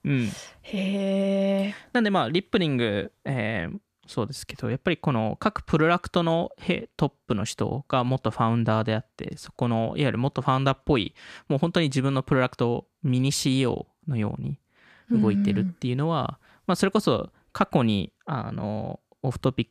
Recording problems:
none

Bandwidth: 14.5 kHz